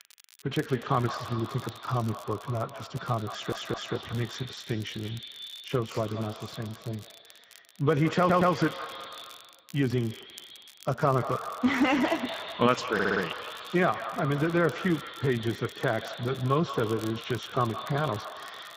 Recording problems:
echo of what is said; strong; throughout; 170 ms later, 10 dB below the speech
garbled, watery; badly; nothing above 7.5 kHz
muffled; very slightly; fading above 4 kHz
crackle, like an old record; faint; 20 dB below the speech
audio stuttering; at 3.5 s, at 8 s and at 13 s

